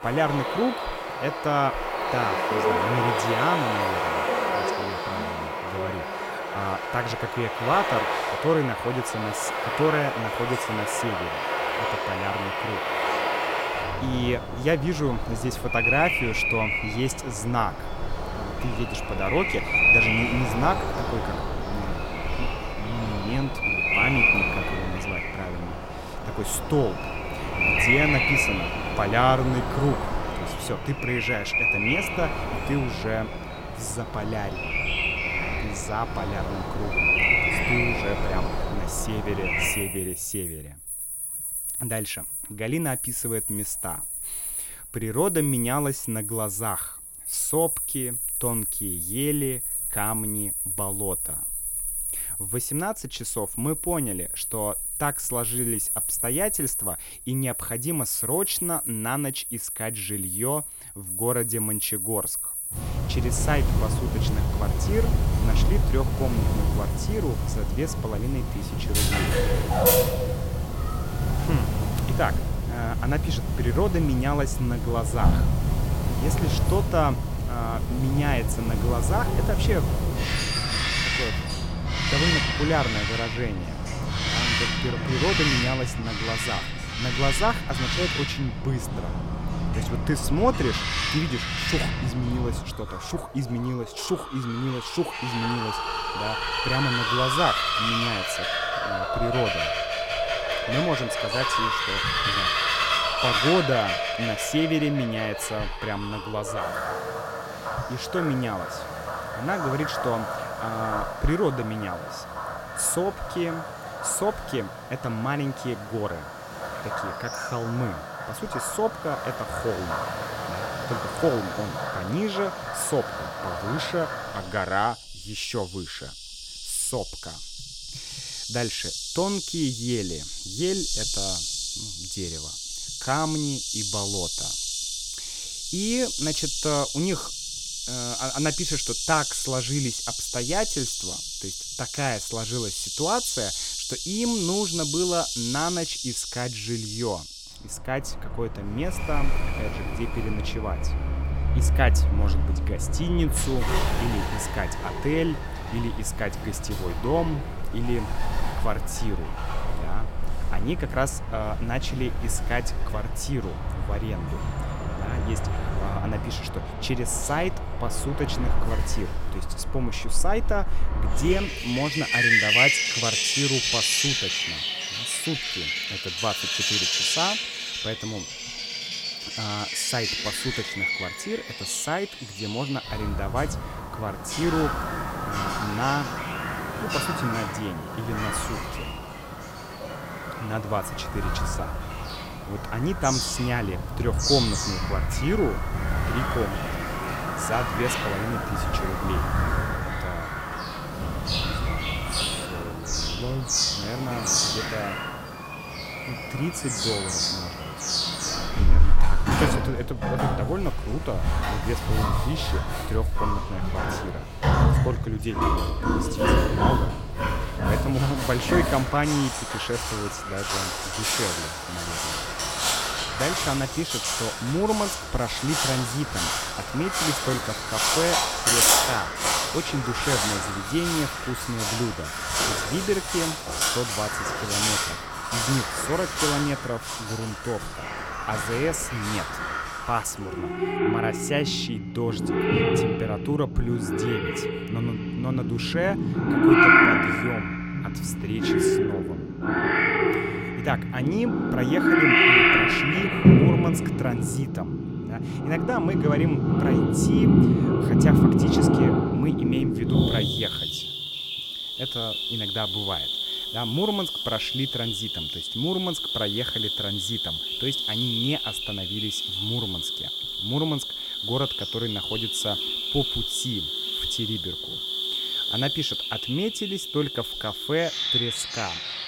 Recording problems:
animal sounds; very loud; throughout; 4 dB above the speech

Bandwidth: 16.5 kHz